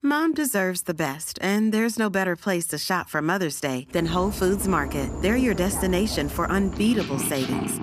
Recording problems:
animal sounds; loud; from 4 s on; 8 dB below the speech

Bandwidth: 14.5 kHz